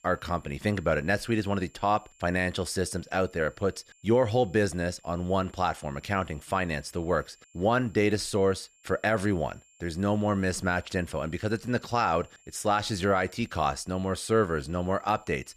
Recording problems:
high-pitched whine; faint; throughout; 7.5 kHz, 30 dB below the speech

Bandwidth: 14.5 kHz